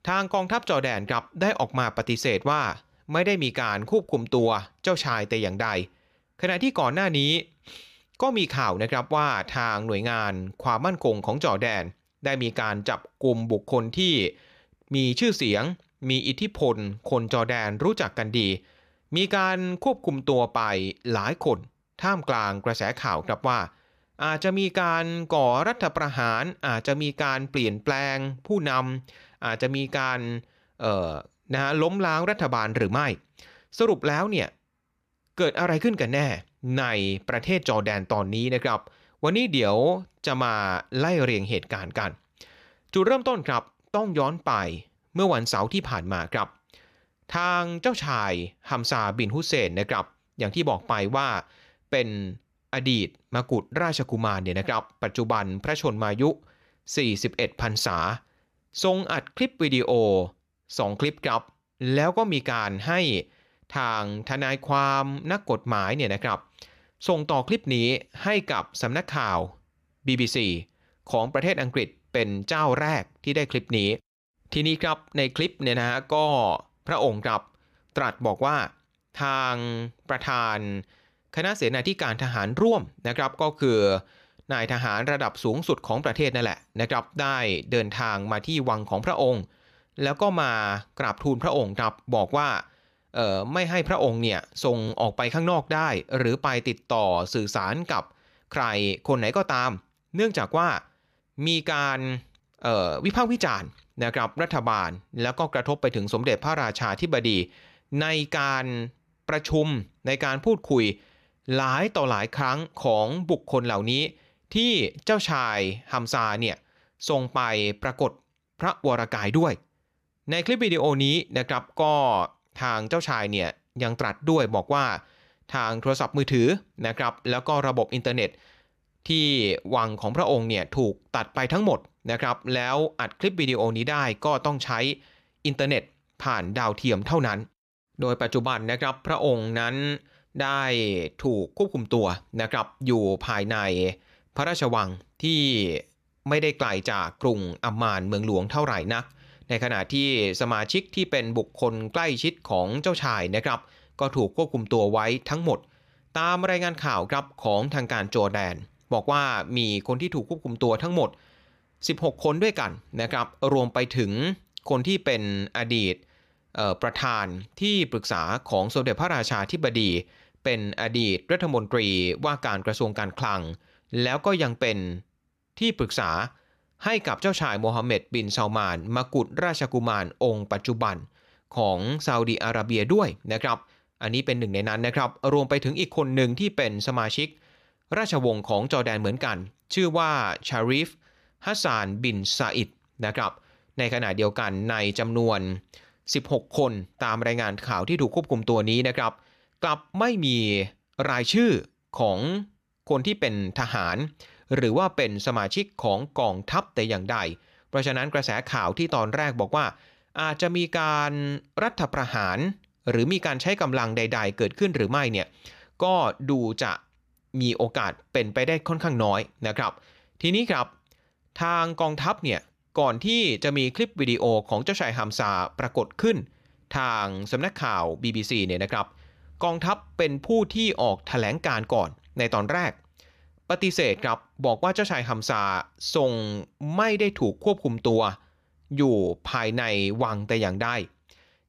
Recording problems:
none

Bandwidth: 14.5 kHz